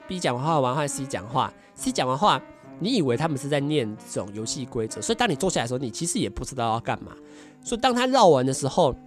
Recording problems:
background music; faint; throughout; 20 dB below the speech

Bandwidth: 14.5 kHz